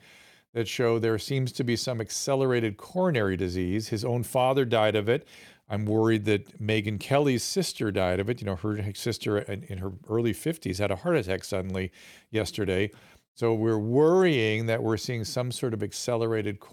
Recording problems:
none

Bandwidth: 18 kHz